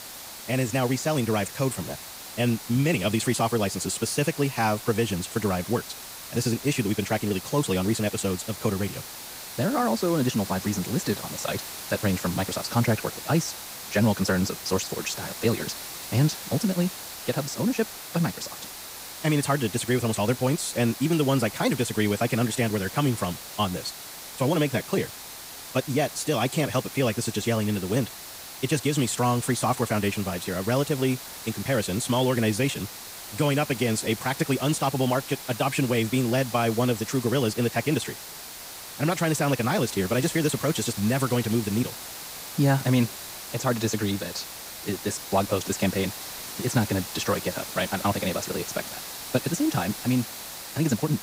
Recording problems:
wrong speed, natural pitch; too fast; 1.5 times normal speed
hiss; loud; throughout; 10 dB below the speech

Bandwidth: 15.5 kHz